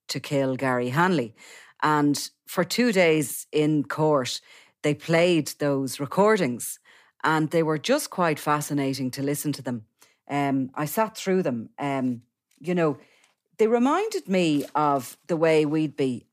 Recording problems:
none

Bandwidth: 15 kHz